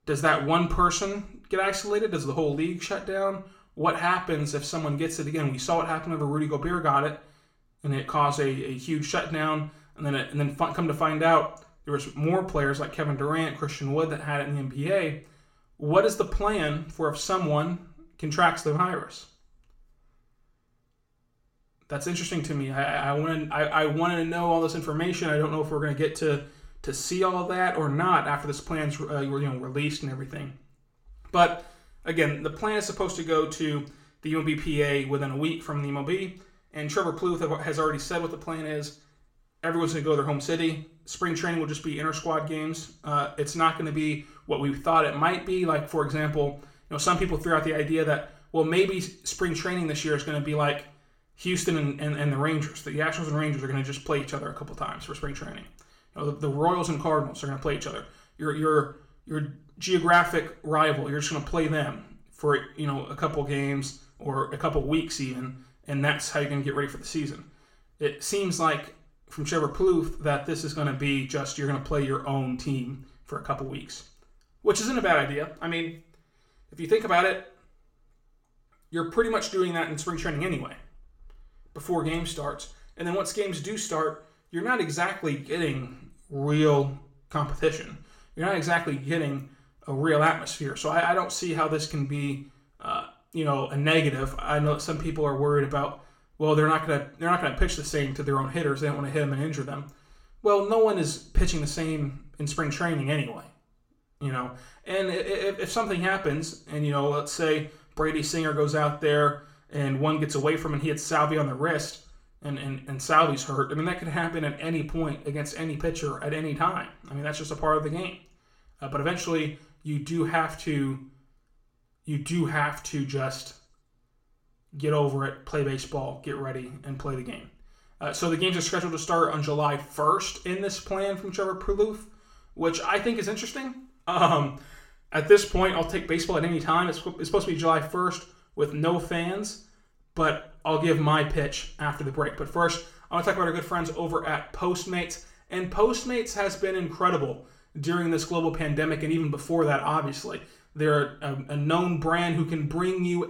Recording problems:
room echo; very slight; dies away in 0.4 s
off-mic speech; somewhat distant

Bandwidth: 16.5 kHz